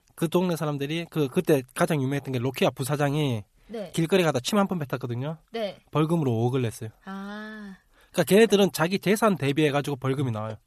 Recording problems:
none

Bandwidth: 14 kHz